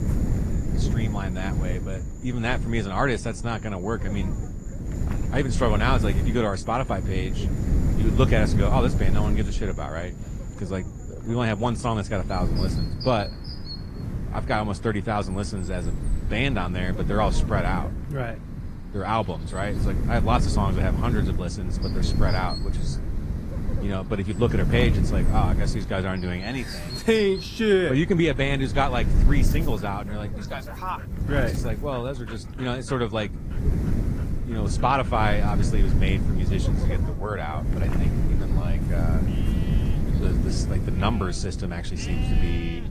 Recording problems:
garbled, watery; slightly; nothing above 14.5 kHz
wind noise on the microphone; heavy; 10 dB below the speech
animal sounds; noticeable; throughout; 20 dB below the speech

